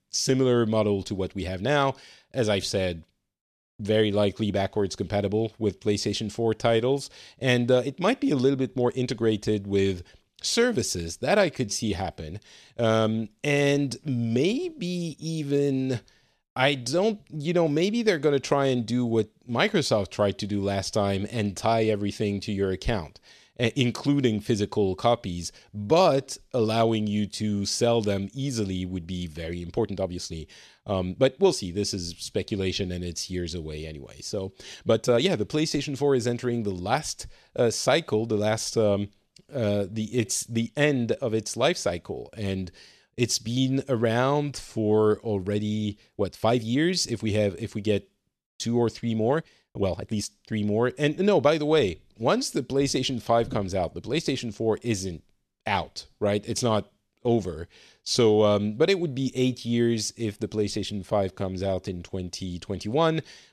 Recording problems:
uneven, jittery; strongly; from 8.5 s to 1:02

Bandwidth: 13.5 kHz